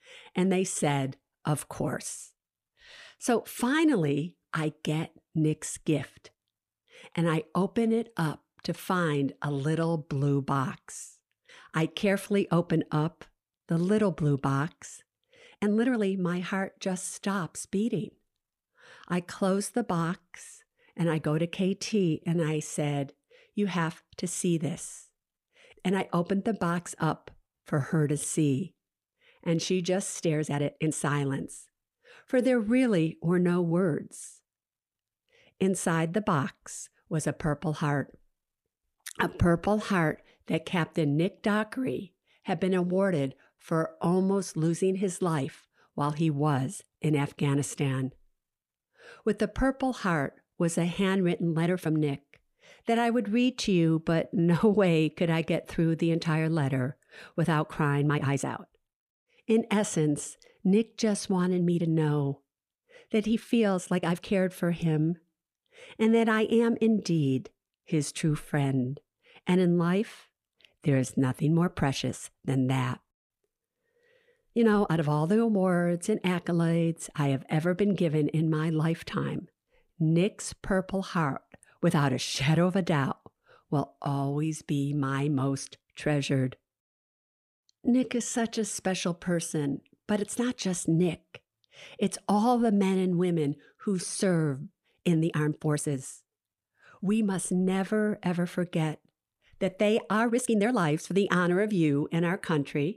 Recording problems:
uneven, jittery; strongly; from 14 s to 1:42

